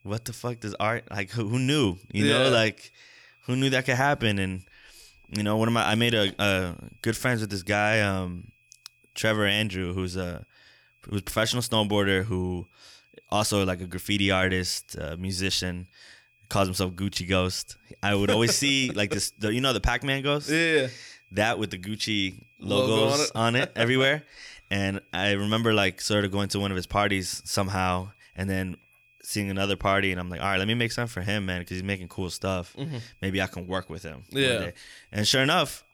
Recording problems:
high-pitched whine; faint; throughout; 2.5 kHz, 35 dB below the speech

